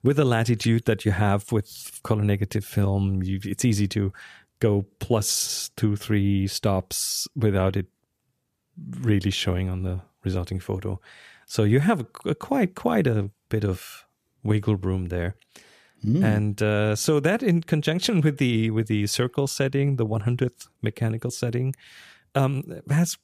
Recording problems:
none

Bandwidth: 14.5 kHz